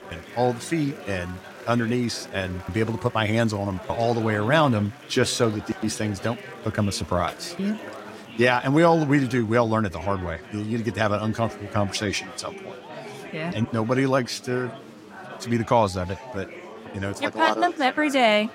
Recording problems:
chatter from many people; noticeable; throughout; 15 dB below the speech

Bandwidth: 16 kHz